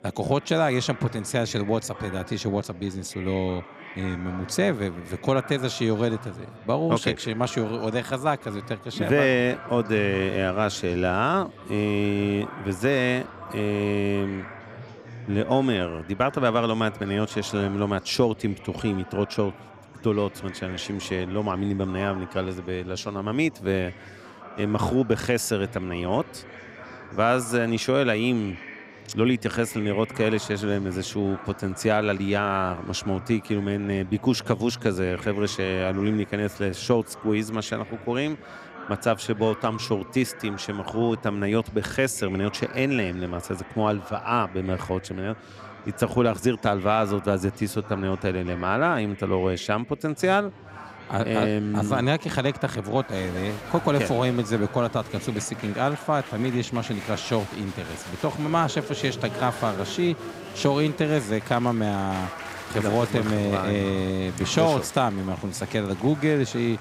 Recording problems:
murmuring crowd; noticeable; throughout; 15 dB below the speech

